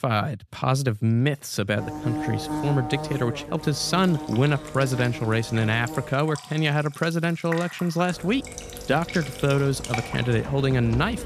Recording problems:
electrical hum; loud; from 2 to 6 s and from 8 s on; 50 Hz, 10 dB below the speech
household noises; noticeable; from 4 s on; 15 dB below the speech

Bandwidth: 14.5 kHz